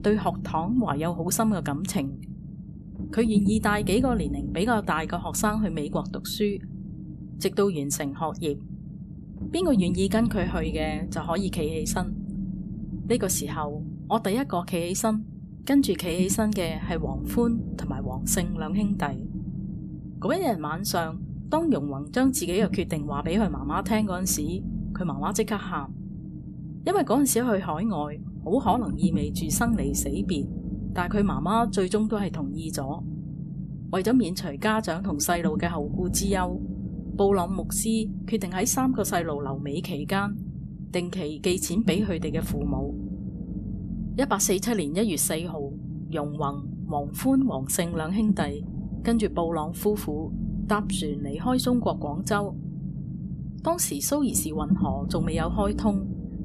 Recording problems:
low rumble; noticeable; throughout; 15 dB below the speech

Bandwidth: 13.5 kHz